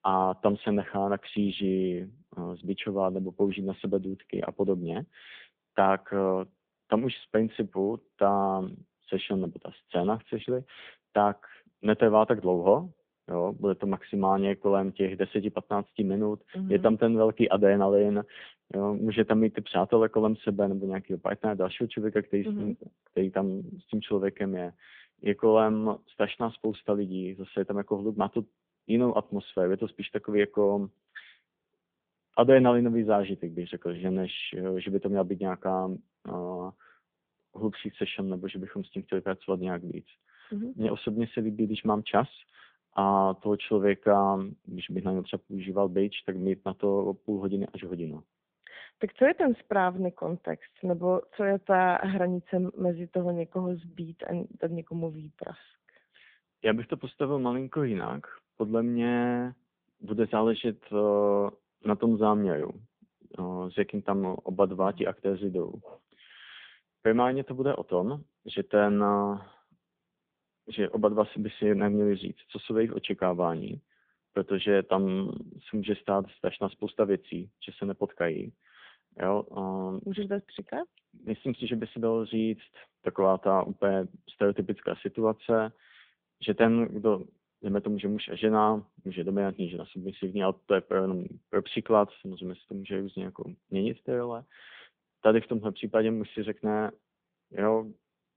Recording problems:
phone-call audio

